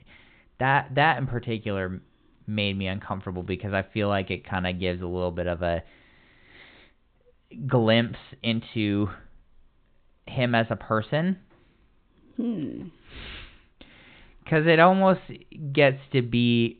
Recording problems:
high frequencies cut off; severe; nothing above 4 kHz

